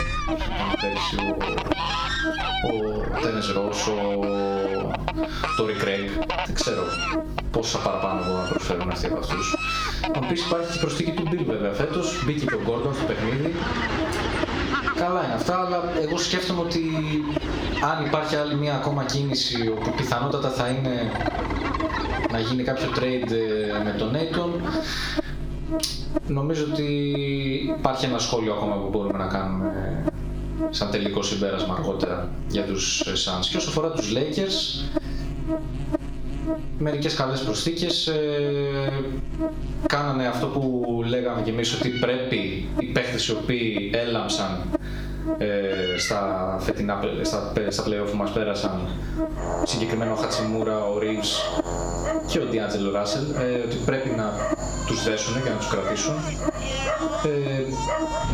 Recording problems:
squashed, flat; heavily, background pumping
room echo; slight; dies away in 0.4 s
off-mic speech; somewhat distant
electrical hum; loud; throughout; 50 Hz, 9 dB below the speech
animal sounds; loud; throughout; 6 dB below the speech

